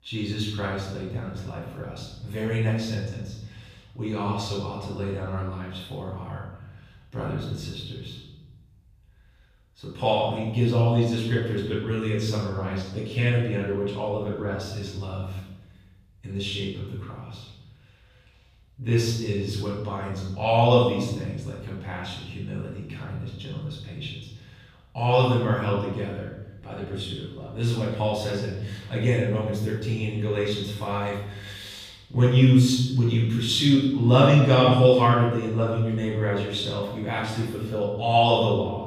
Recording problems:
off-mic speech; far
room echo; noticeable; dies away in 1 s

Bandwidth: 15 kHz